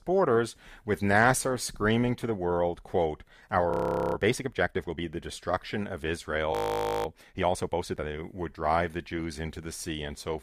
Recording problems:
audio freezing; at 3.5 s and at 6.5 s for 0.5 s

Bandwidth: 15 kHz